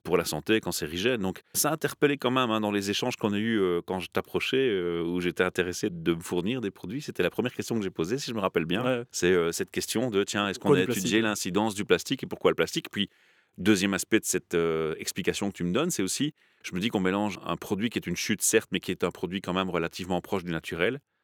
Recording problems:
none

